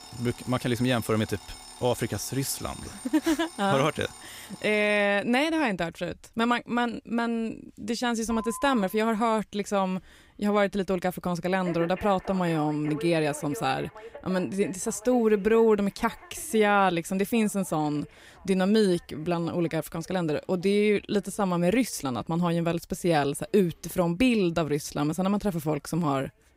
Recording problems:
alarms or sirens; noticeable; throughout; 20 dB below the speech

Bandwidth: 15.5 kHz